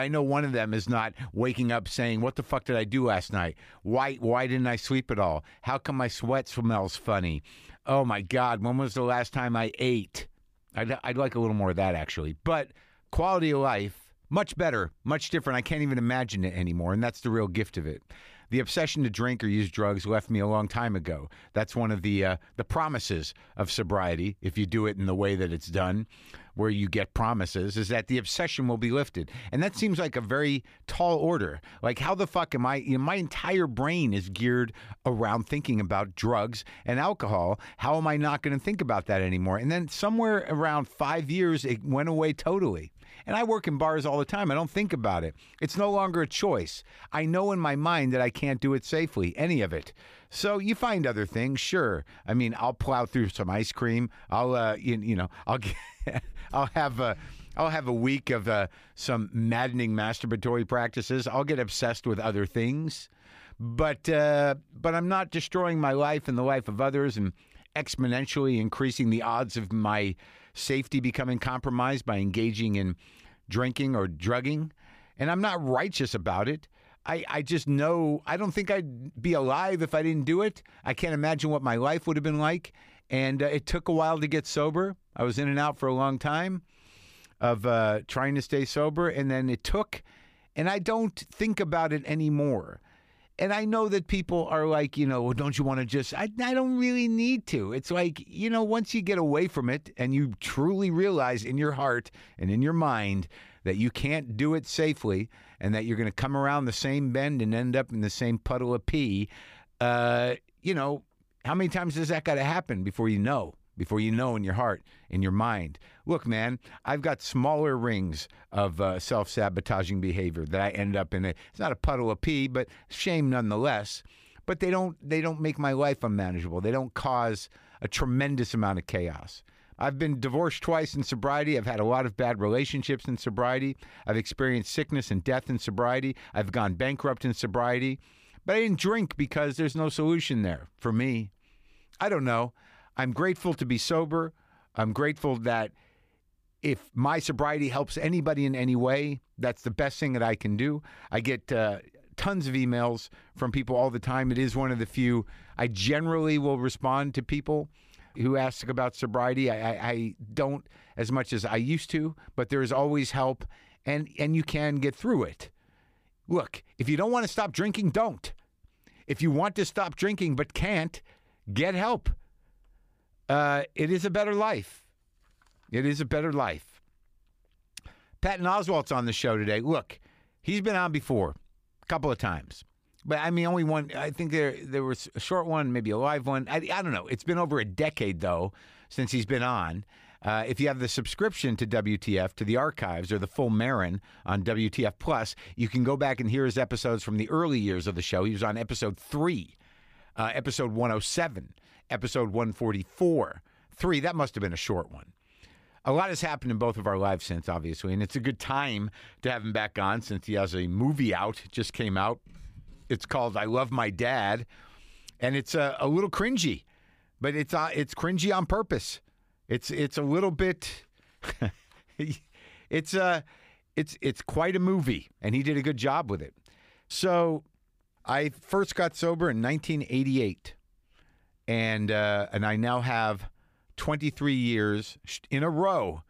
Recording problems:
abrupt cut into speech; at the start

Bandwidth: 15 kHz